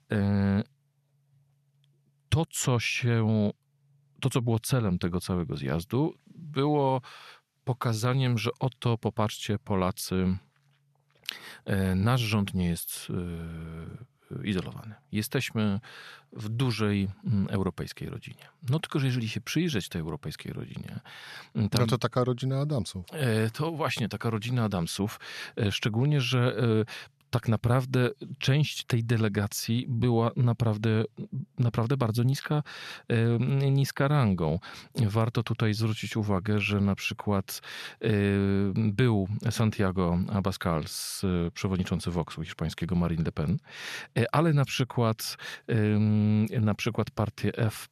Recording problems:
none

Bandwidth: 13.5 kHz